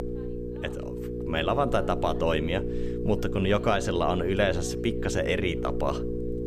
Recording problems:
electrical hum; loud; throughout; 60 Hz, 8 dB below the speech
voice in the background; faint; throughout; 30 dB below the speech

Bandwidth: 15 kHz